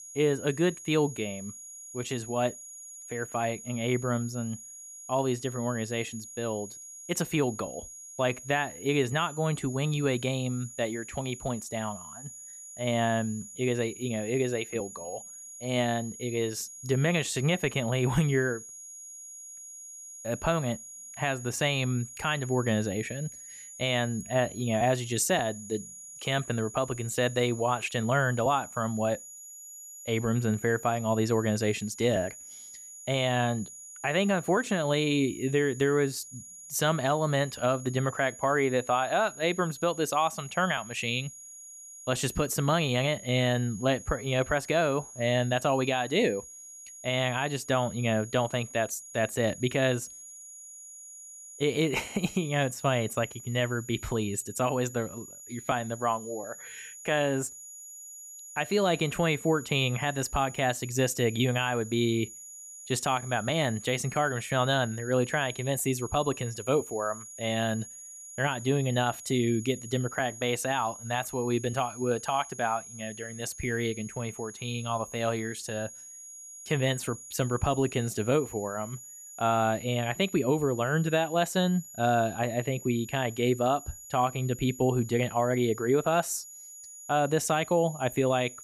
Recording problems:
high-pitched whine; noticeable; throughout; 6.5 kHz, 15 dB below the speech

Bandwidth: 14.5 kHz